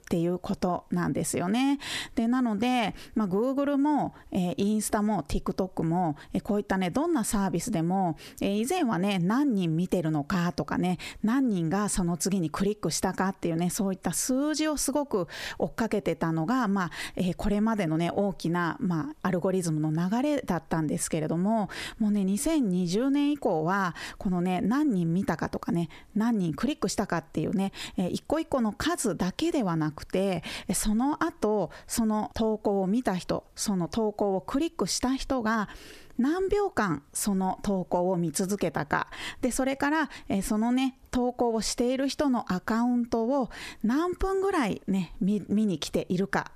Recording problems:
squashed, flat; heavily

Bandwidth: 14.5 kHz